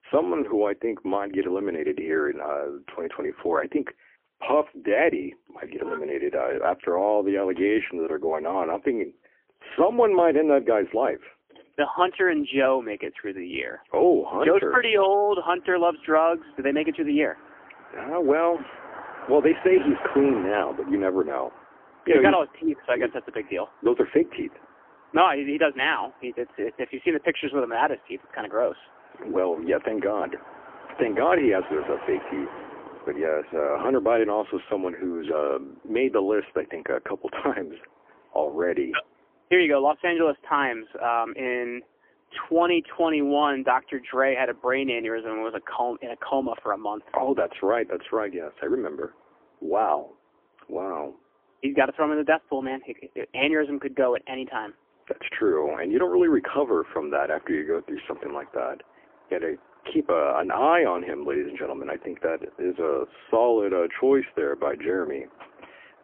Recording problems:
phone-call audio; poor line; nothing above 3 kHz
traffic noise; noticeable; throughout; 20 dB below the speech

